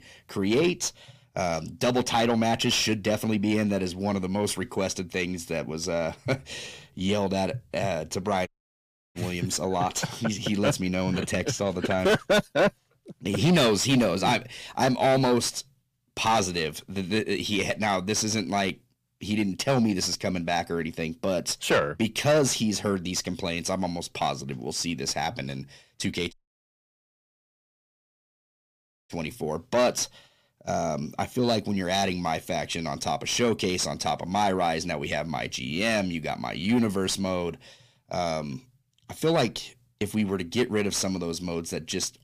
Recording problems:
distortion; heavy; 6 dB below the speech
audio cutting out; at 8.5 s for 0.5 s and at 26 s for 3 s

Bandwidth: 15 kHz